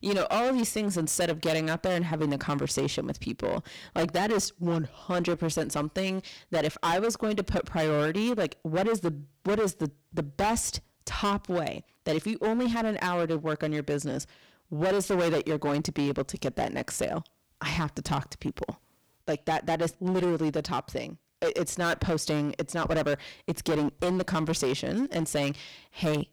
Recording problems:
distortion; heavy; 15% of the sound clipped

